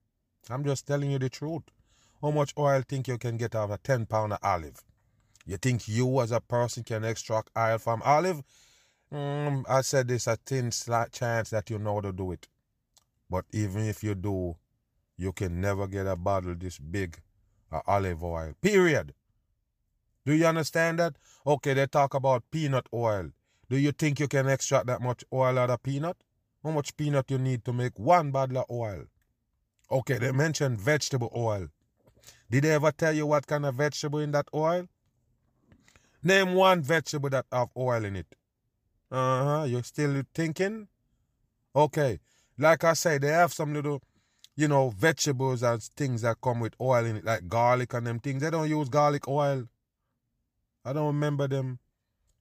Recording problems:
none

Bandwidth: 15 kHz